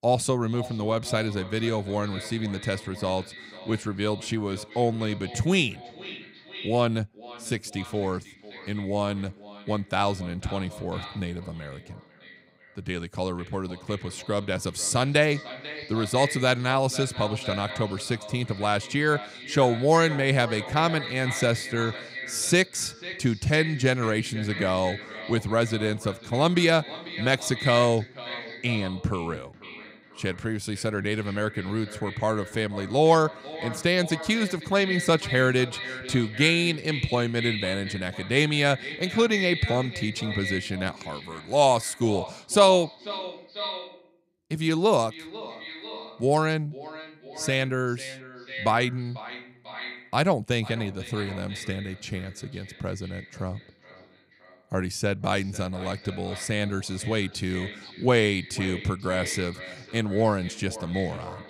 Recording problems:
echo of what is said; strong; throughout; 490 ms later, 10 dB below the speech

